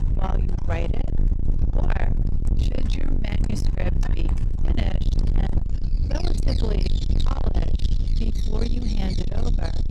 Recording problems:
distortion; heavy; 6 dB below the speech
animal sounds; loud; throughout; 9 dB below the speech
low rumble; loud; throughout; 4 dB below the speech

